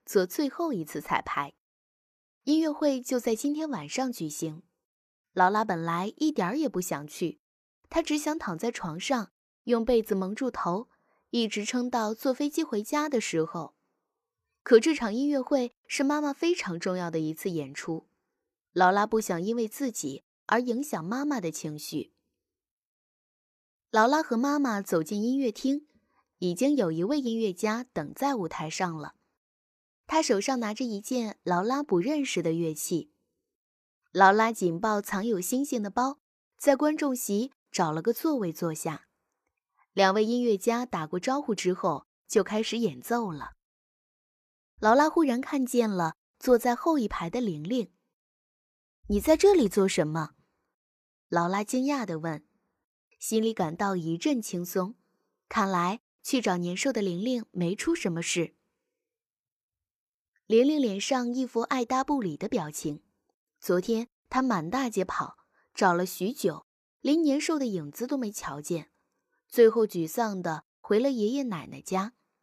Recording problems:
none

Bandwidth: 14 kHz